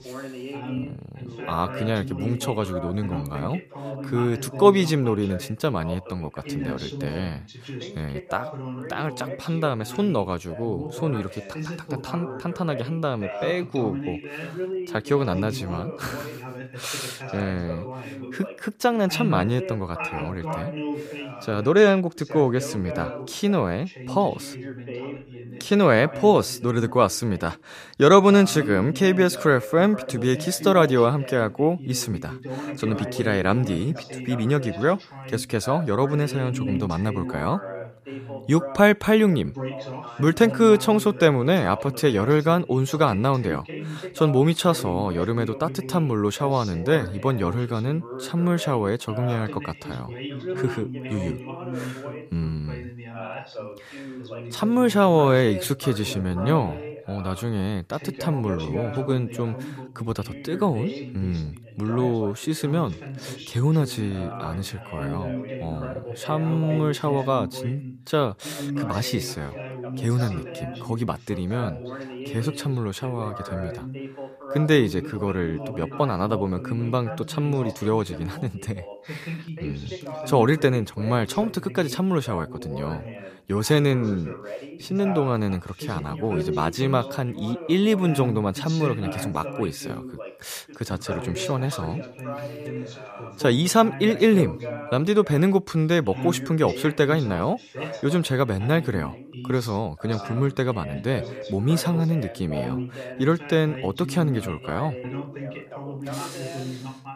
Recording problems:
background chatter; noticeable; throughout; 2 voices, 10 dB below the speech

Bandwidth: 14.5 kHz